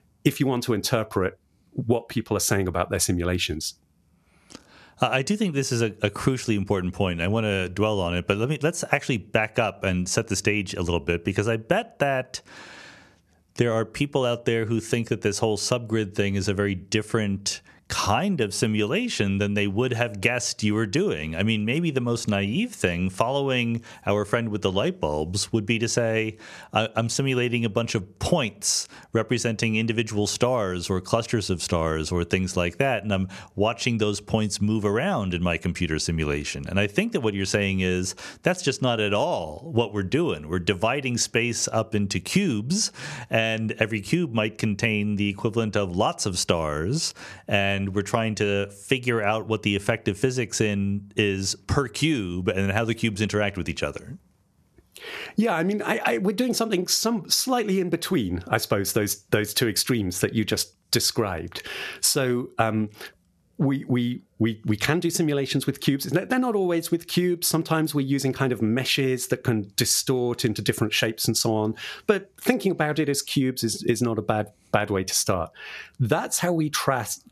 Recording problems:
squashed, flat; somewhat

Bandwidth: 13.5 kHz